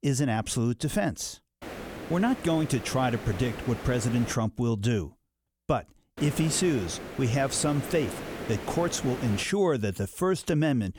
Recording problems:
hiss; noticeable; from 1.5 to 4.5 s and from 6 to 9.5 s; 10 dB below the speech

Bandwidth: 18.5 kHz